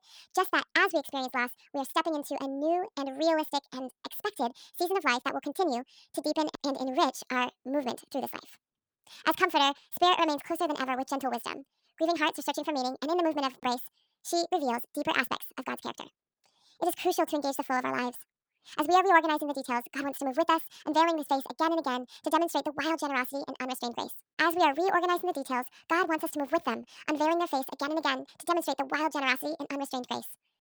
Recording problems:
wrong speed and pitch; too fast and too high; 1.6 times normal speed

